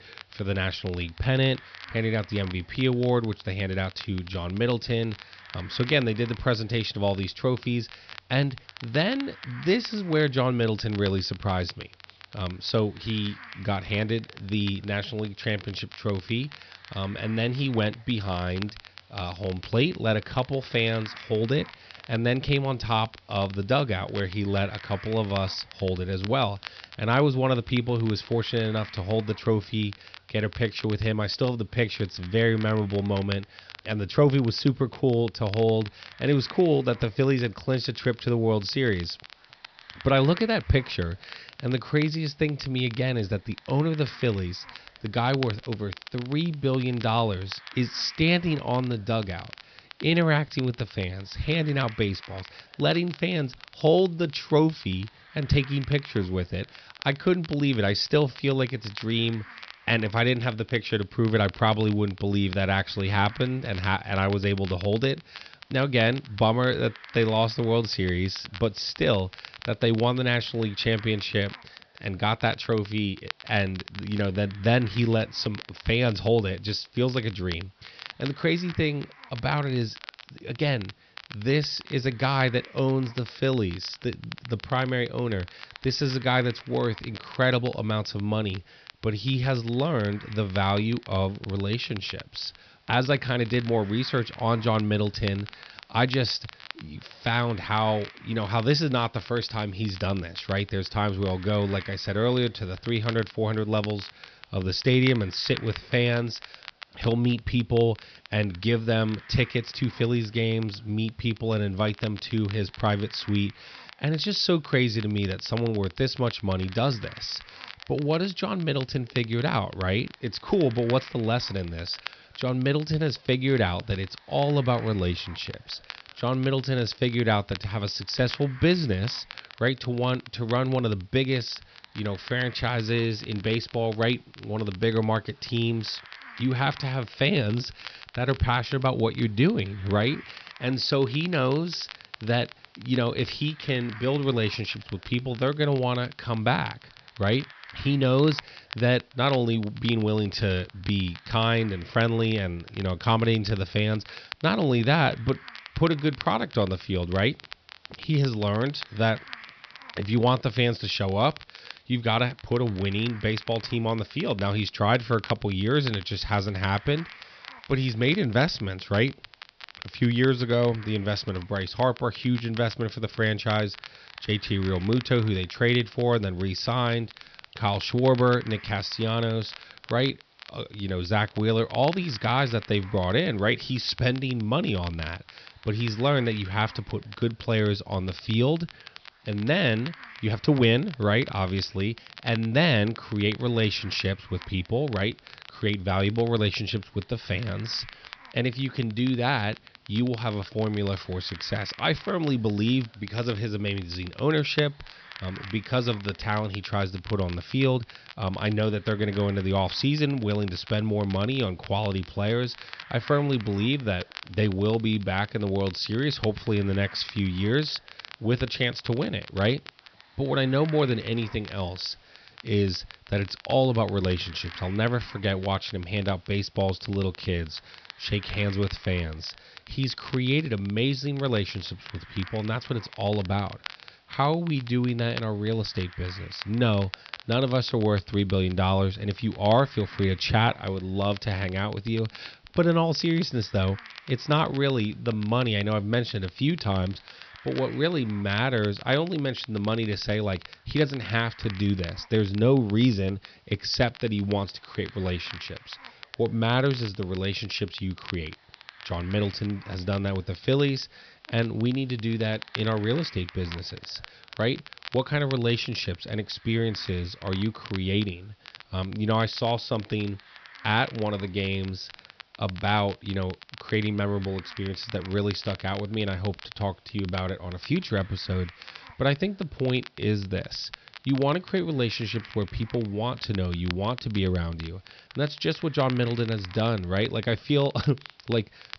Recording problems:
high frequencies cut off; noticeable; nothing above 5.5 kHz
crackle, like an old record; noticeable; 20 dB below the speech
hiss; faint; throughout; 25 dB below the speech

